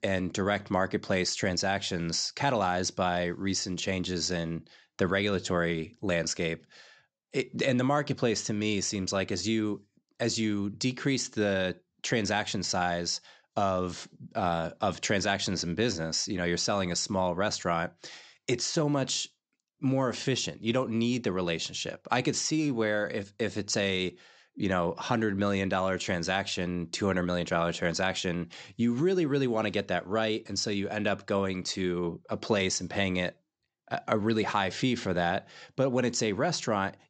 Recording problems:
high frequencies cut off; noticeable; nothing above 8 kHz

